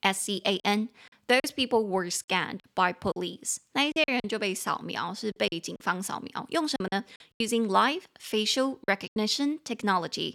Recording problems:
choppy; very; 7% of the speech affected

